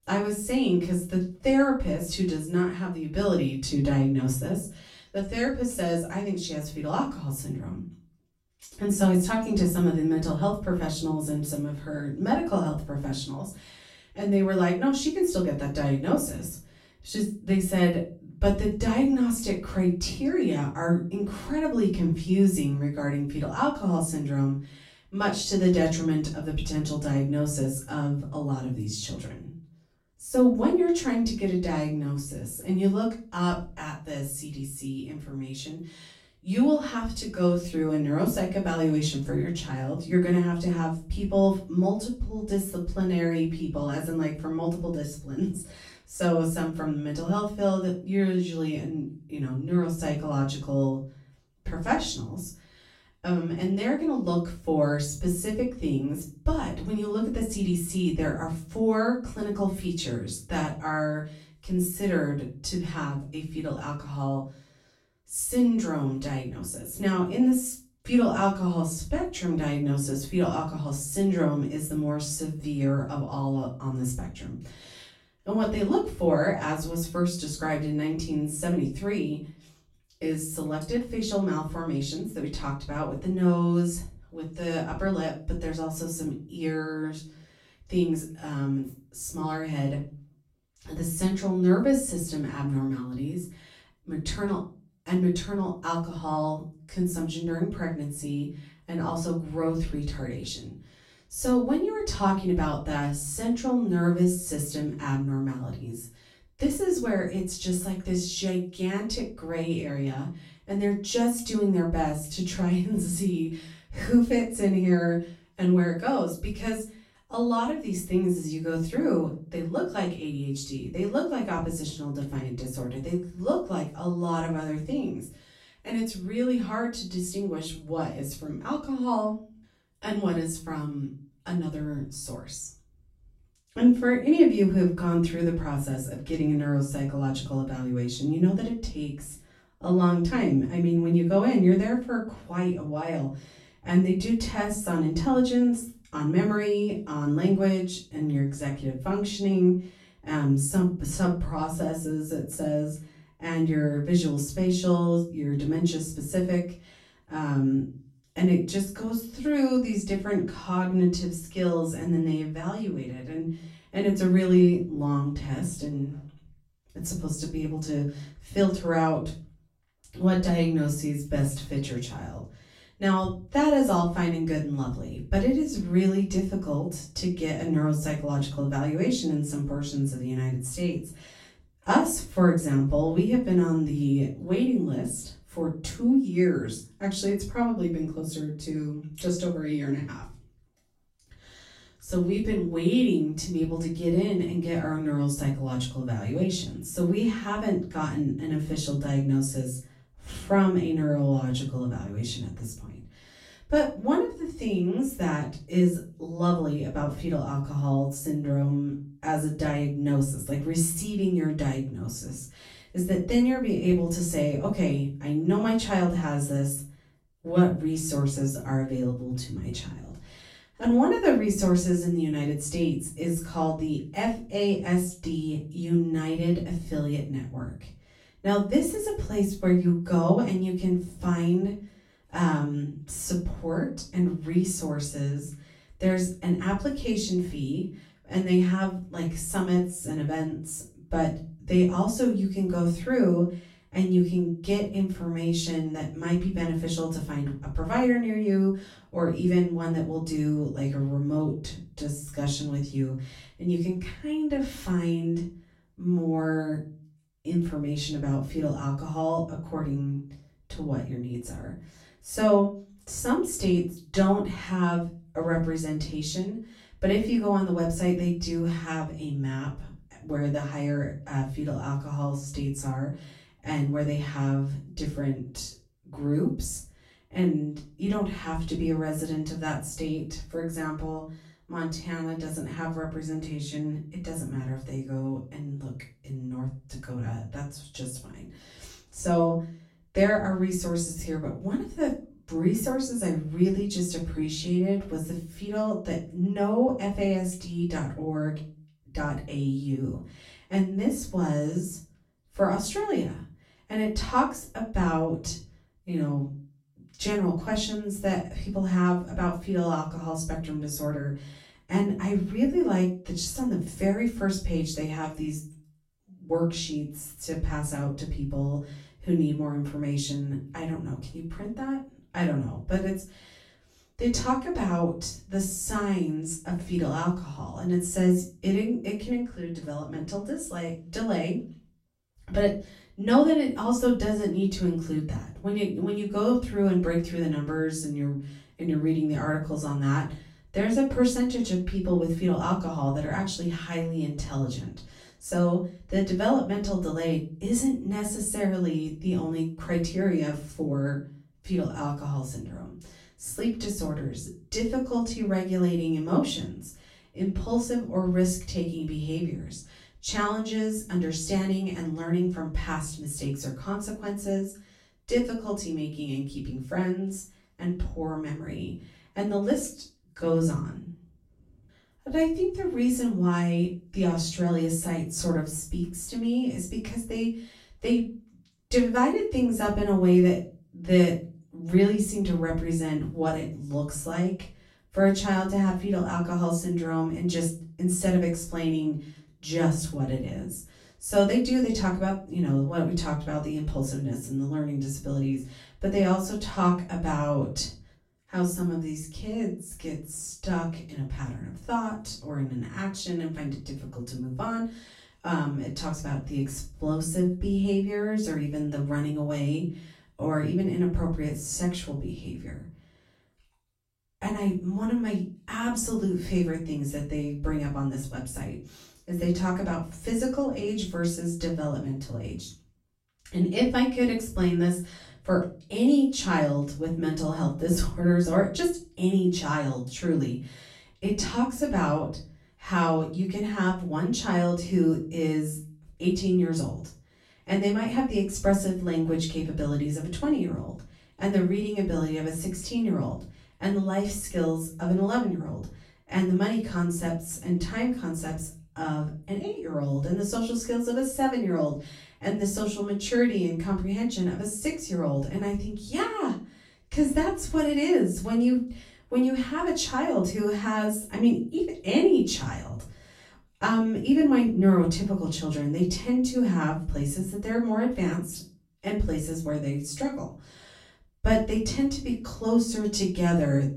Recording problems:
off-mic speech; far
room echo; slight; dies away in 0.3 s

